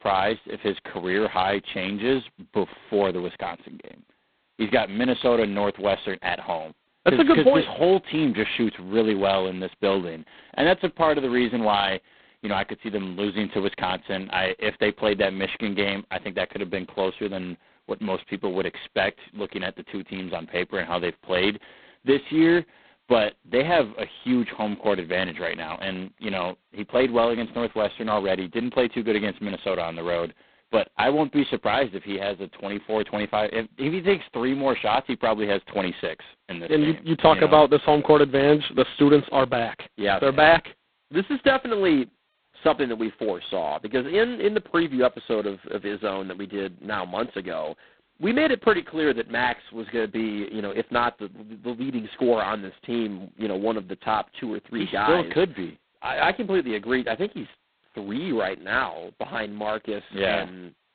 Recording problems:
phone-call audio; poor line; nothing above 4 kHz

